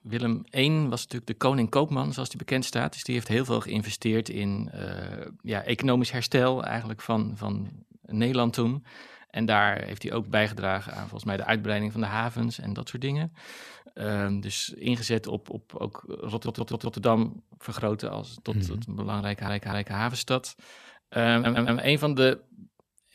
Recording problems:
audio stuttering; at 16 s, at 19 s and at 21 s

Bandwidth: 14 kHz